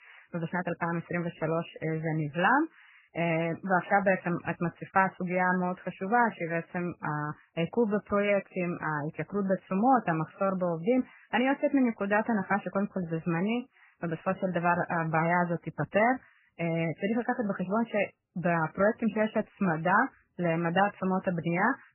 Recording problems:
garbled, watery; badly; nothing above 3 kHz

